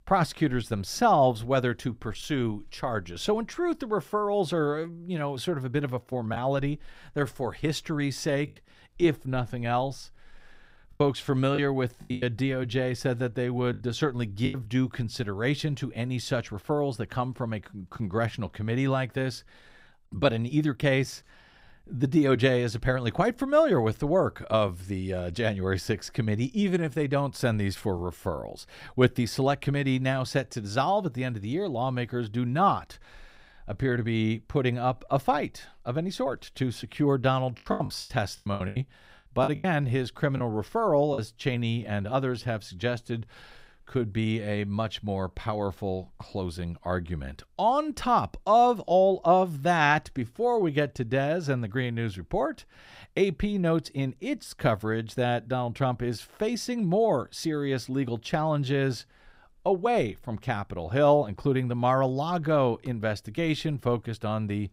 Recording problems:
choppy; very; from 6.5 to 8.5 s, from 11 to 15 s and from 38 to 41 s; 12% of the speech affected

